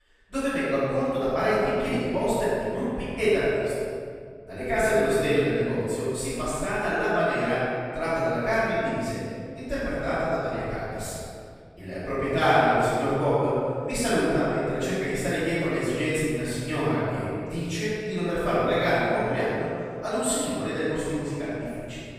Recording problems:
room echo; strong; dies away in 2.2 s
off-mic speech; far

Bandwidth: 15 kHz